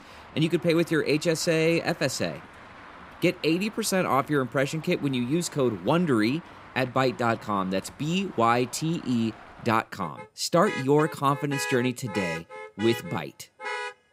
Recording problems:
traffic noise; noticeable; throughout; 15 dB below the speech

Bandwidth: 15.5 kHz